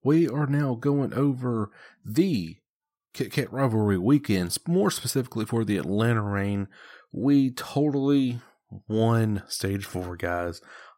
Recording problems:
none

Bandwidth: 16 kHz